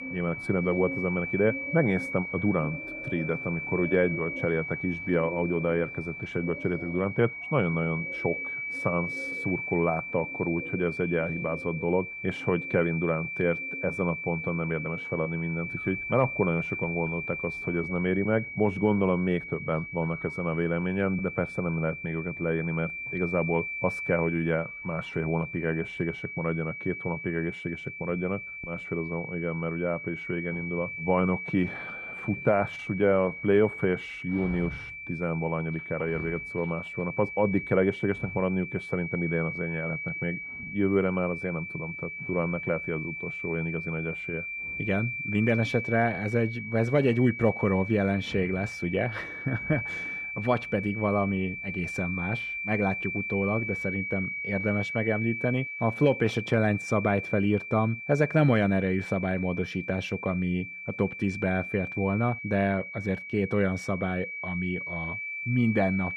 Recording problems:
muffled; slightly; fading above 3 kHz
high-pitched whine; loud; throughout; 2.5 kHz, 6 dB below the speech
animal sounds; noticeable; throughout; 20 dB below the speech

